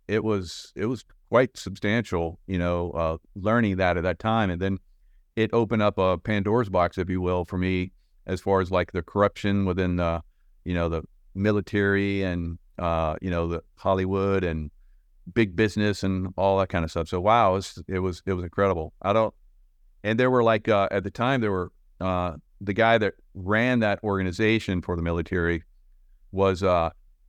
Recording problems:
none

